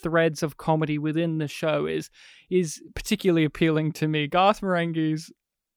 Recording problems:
none

